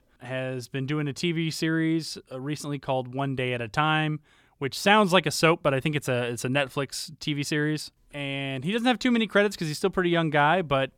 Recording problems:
none

